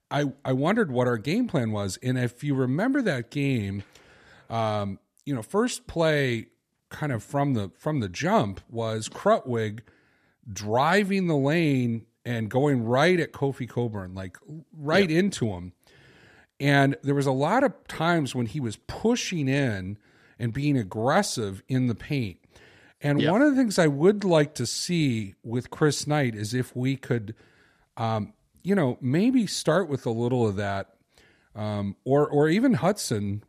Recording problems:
none

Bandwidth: 14.5 kHz